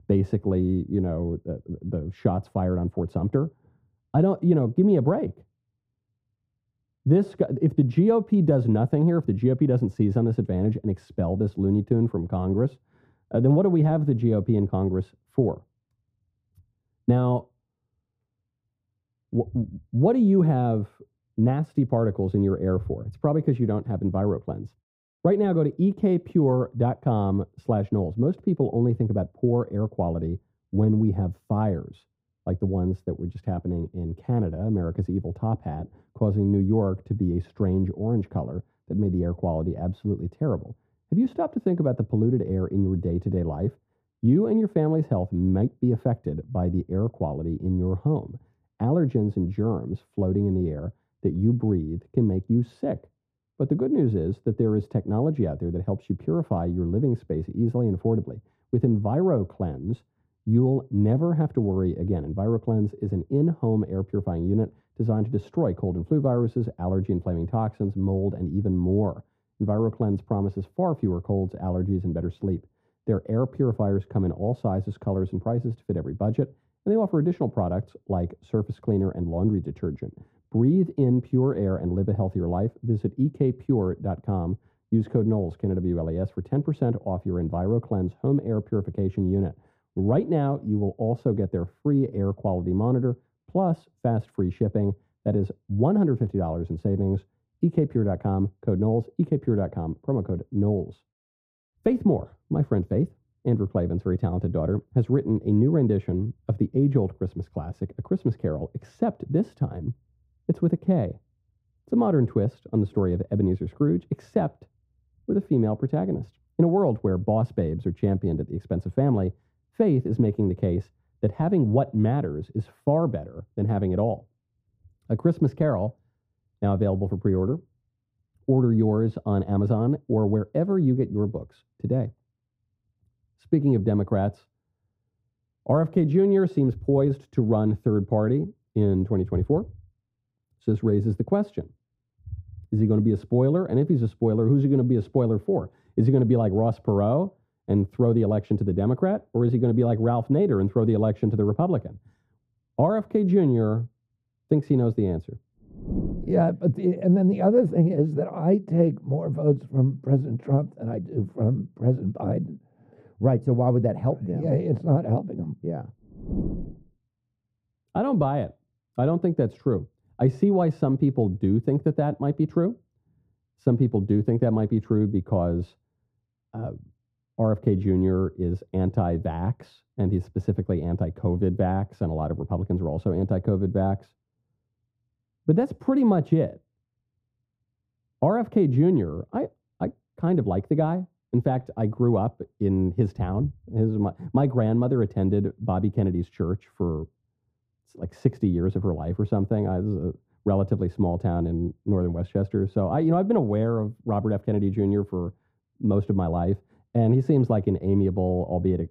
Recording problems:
muffled; very; fading above 1.5 kHz

